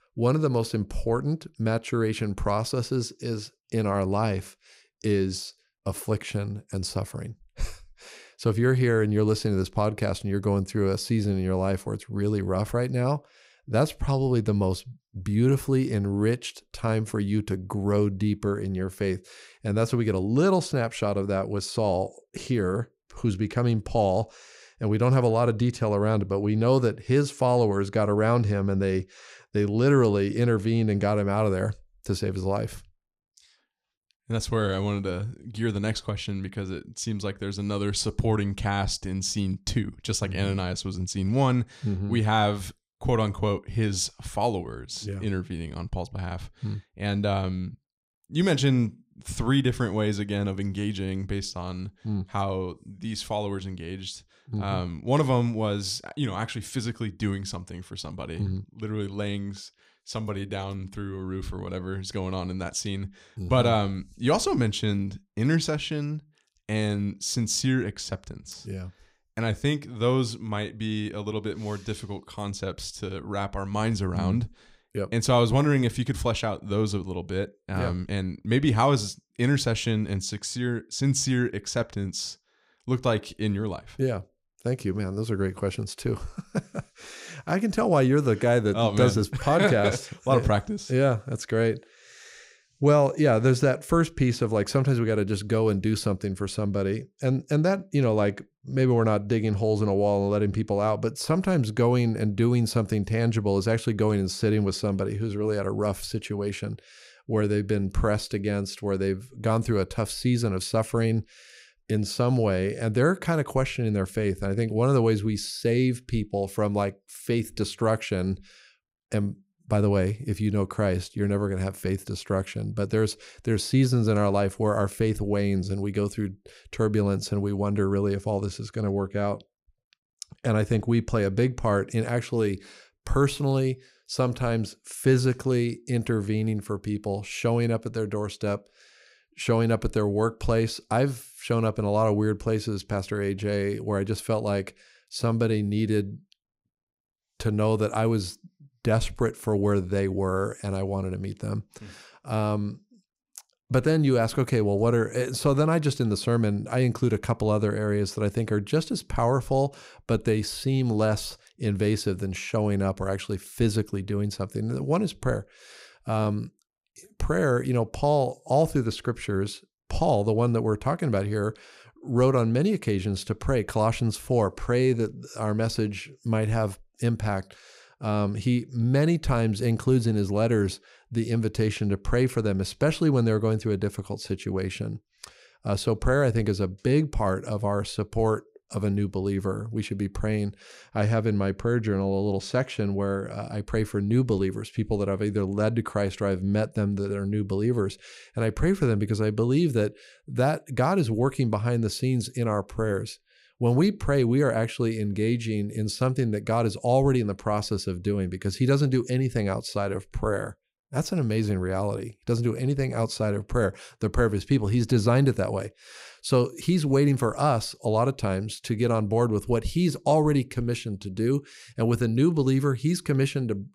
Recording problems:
none

